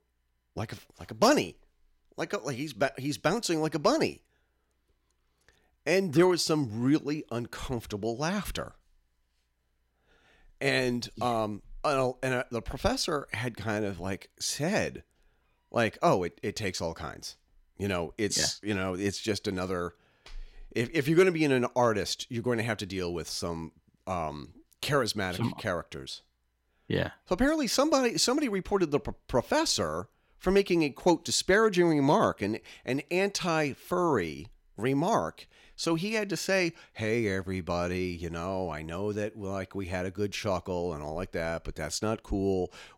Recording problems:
none

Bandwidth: 16.5 kHz